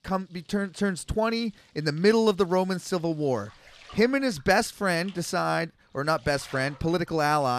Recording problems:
household noises; faint; throughout; 25 dB below the speech
abrupt cut into speech; at the end

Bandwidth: 14 kHz